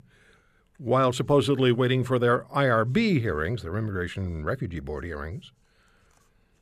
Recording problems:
none

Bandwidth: 14.5 kHz